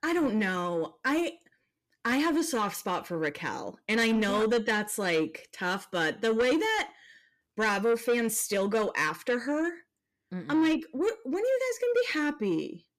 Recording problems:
distortion; slight; 10 dB below the speech

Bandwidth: 14.5 kHz